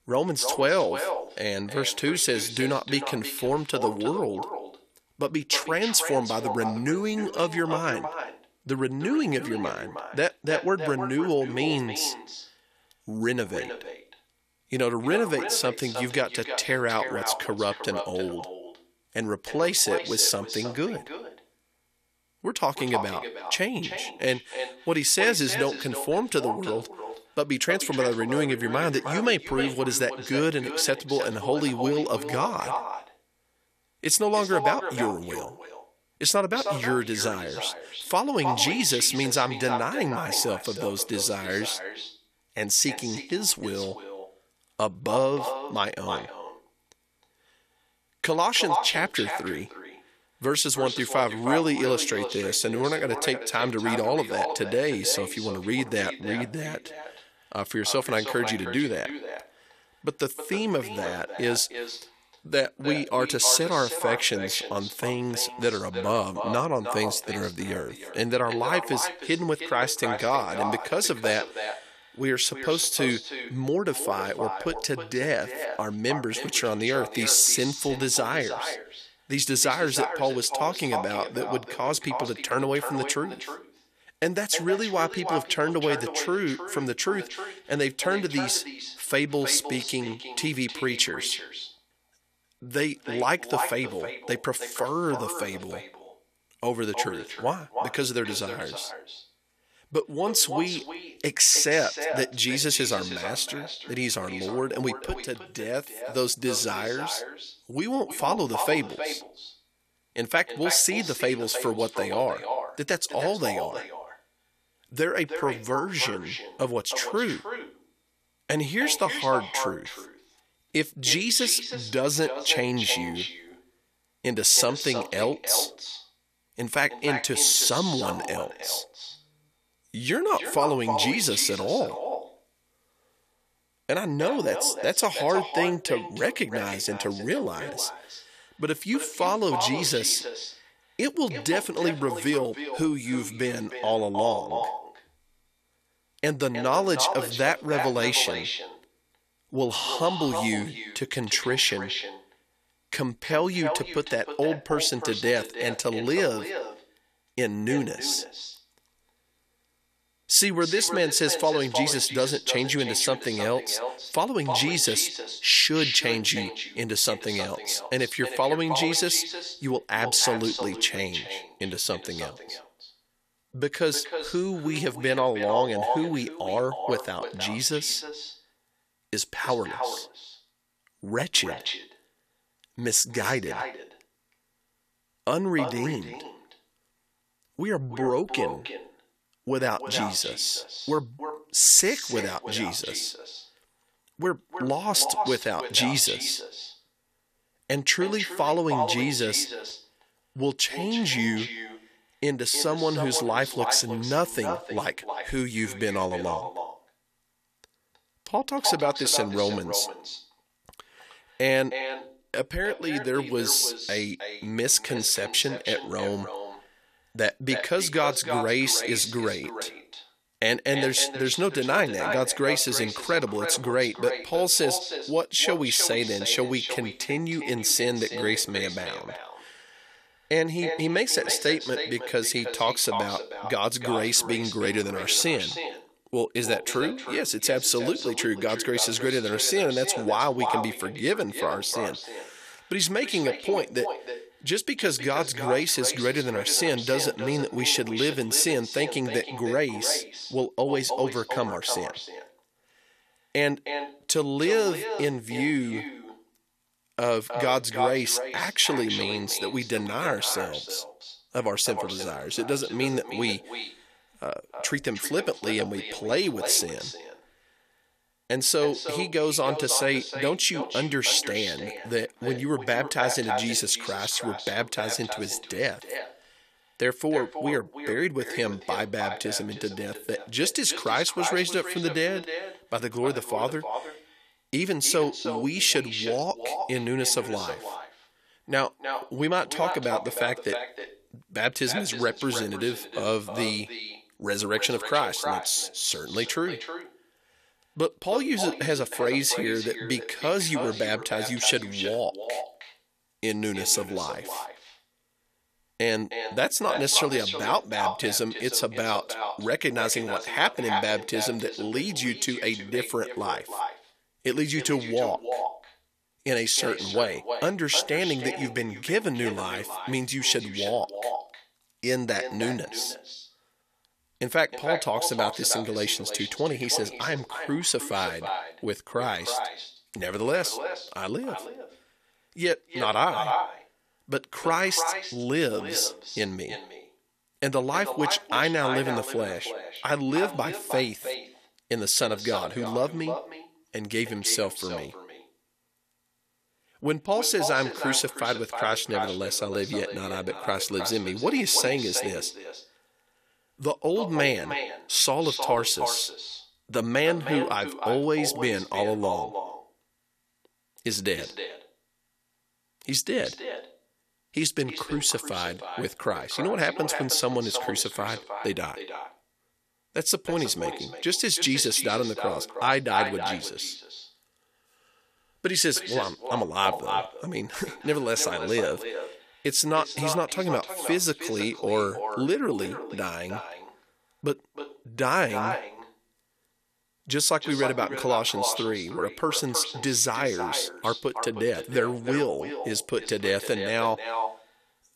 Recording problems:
echo of what is said; strong; throughout; 310 ms later, 8 dB below the speech

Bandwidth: 14.5 kHz